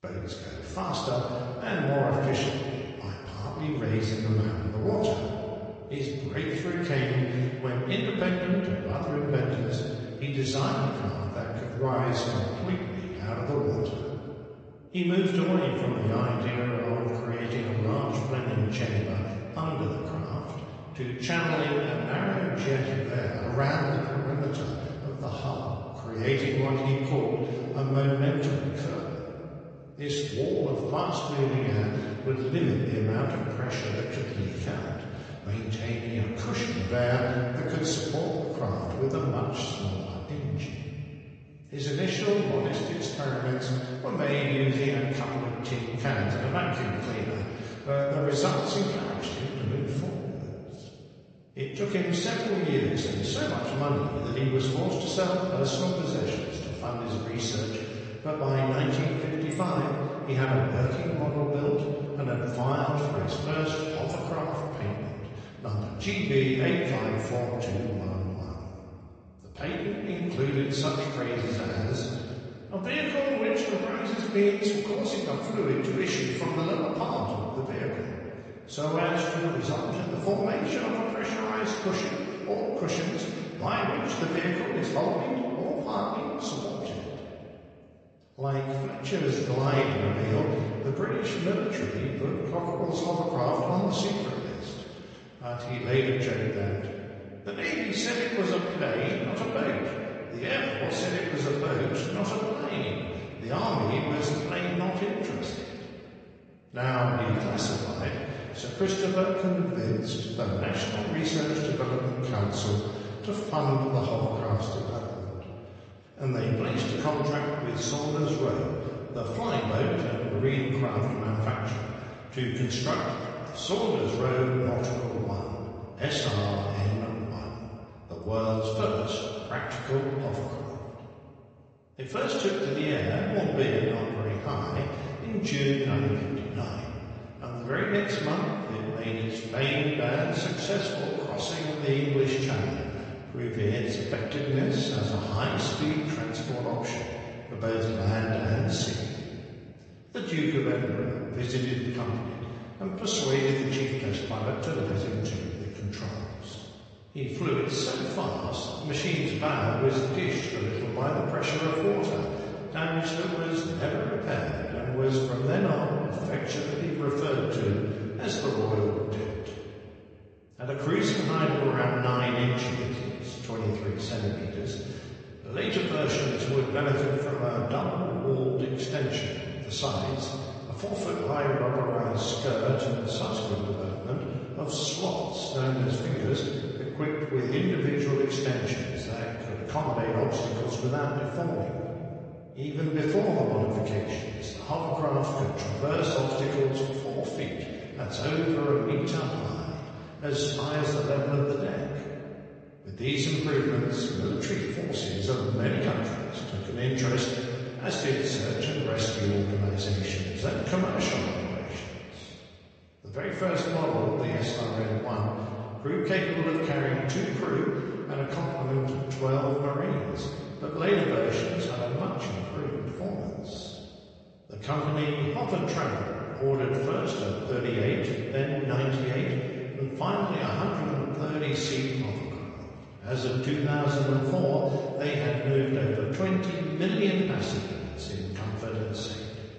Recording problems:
off-mic speech; far
room echo; noticeable; dies away in 2.5 s
garbled, watery; slightly; nothing above 7.5 kHz

